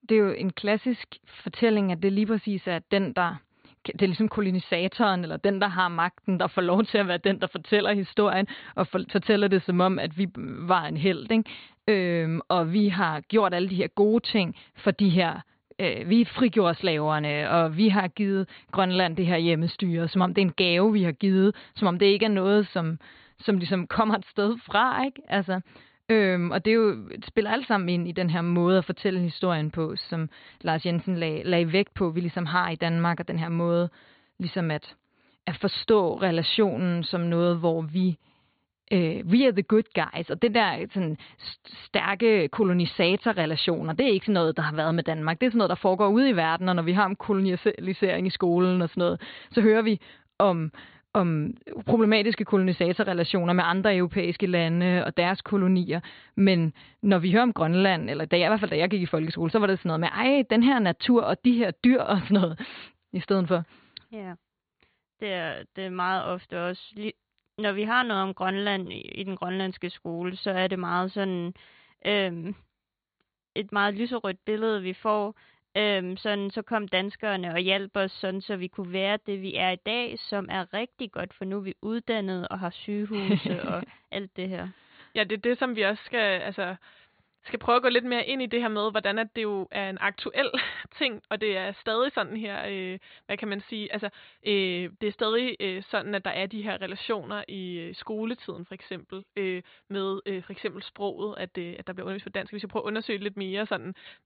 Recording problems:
high frequencies cut off; severe; nothing above 4.5 kHz

